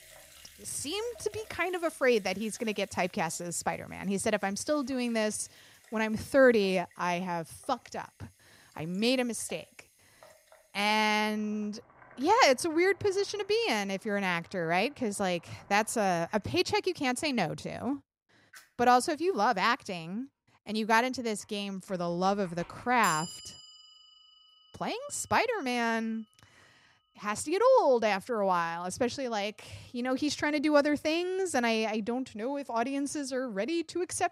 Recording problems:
household noises; faint; throughout; 20 dB below the speech

